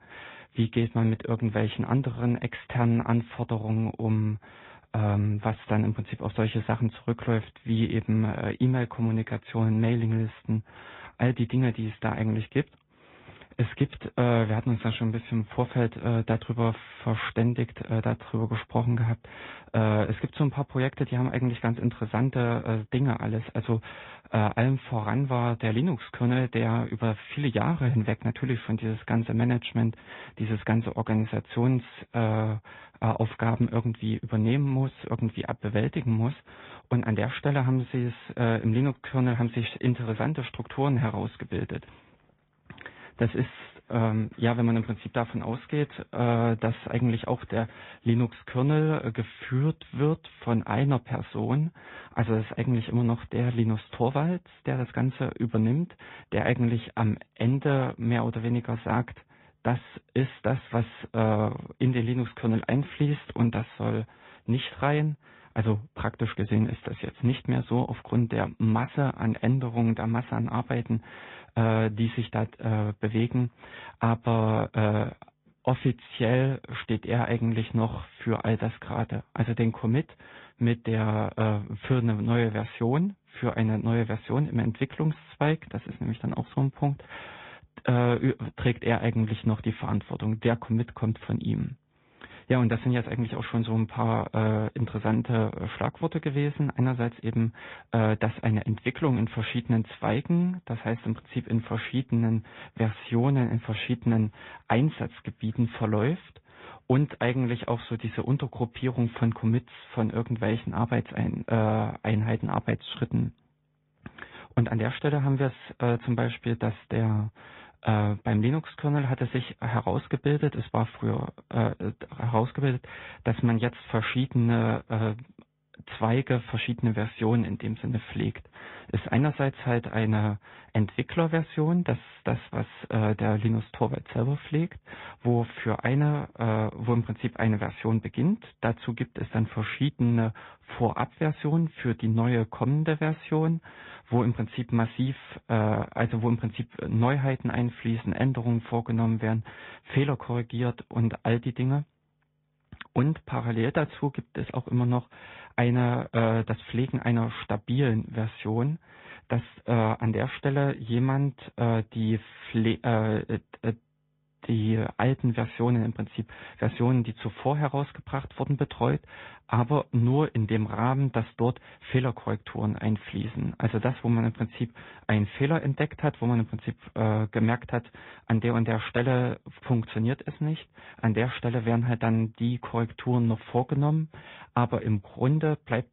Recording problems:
high frequencies cut off; severe; nothing above 3.5 kHz
garbled, watery; slightly

